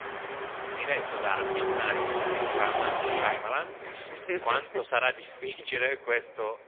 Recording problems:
phone-call audio; poor line; nothing above 3.5 kHz
traffic noise; loud; throughout; 1 dB below the speech

